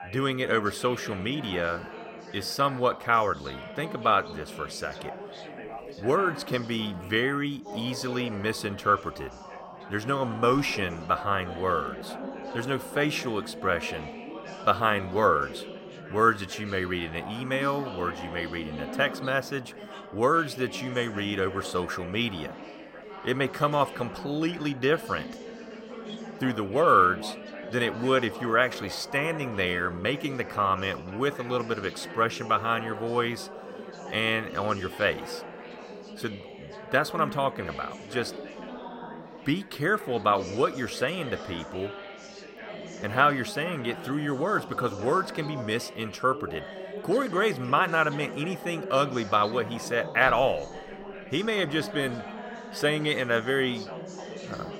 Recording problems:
background chatter; noticeable; throughout; 4 voices, 10 dB below the speech

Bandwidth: 16 kHz